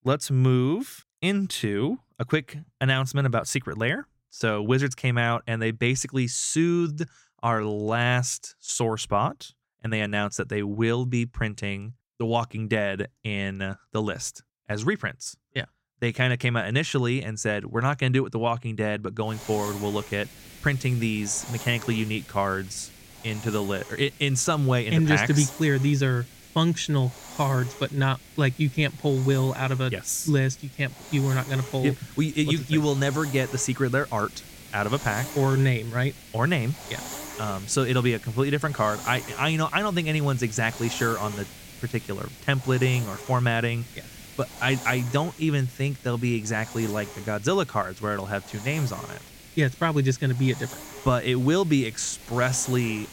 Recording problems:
hiss; noticeable; from 19 s on; 15 dB below the speech

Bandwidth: 16.5 kHz